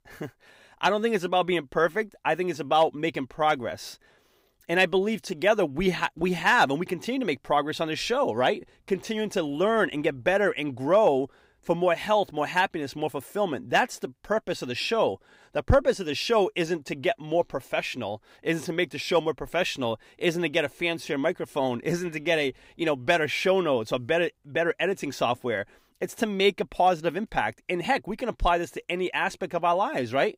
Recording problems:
none

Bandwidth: 15.5 kHz